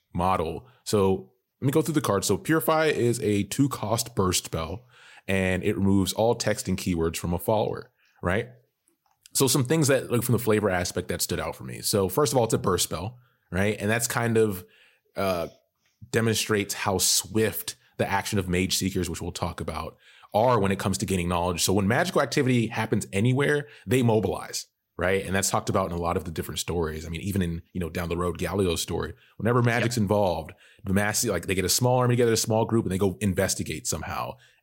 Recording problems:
none

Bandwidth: 16 kHz